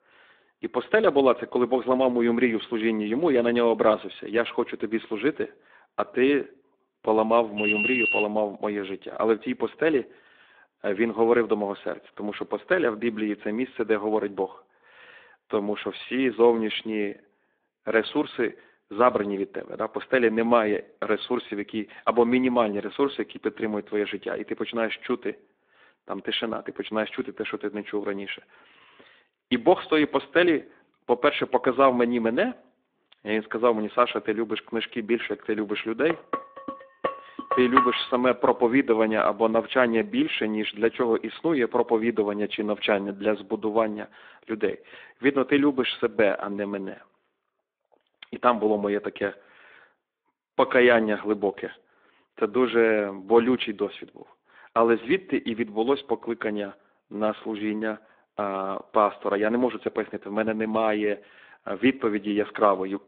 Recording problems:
phone-call audio; nothing above 3.5 kHz
alarm; loud; at 7.5 s; peak 3 dB above the speech
clattering dishes; loud; from 36 to 38 s; peak 2 dB above the speech

